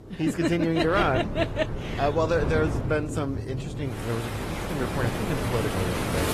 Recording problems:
garbled, watery; slightly; nothing above 14 kHz
rain or running water; loud; throughout; 5 dB below the speech
wind noise on the microphone; occasional gusts; from 1 to 3 s and from 4.5 s on; 10 dB below the speech

